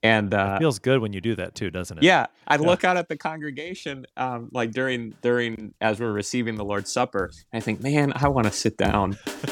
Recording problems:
background music; noticeable; throughout; 15 dB below the speech

